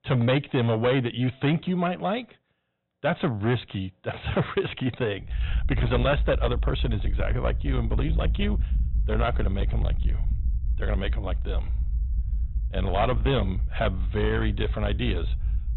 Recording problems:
high frequencies cut off; severe; nothing above 4 kHz
distortion; slight; 10 dB below the speech
low rumble; noticeable; from 5.5 s on; 15 dB below the speech

